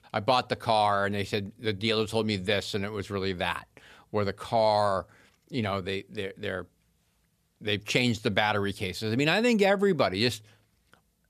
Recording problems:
none

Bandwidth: 14.5 kHz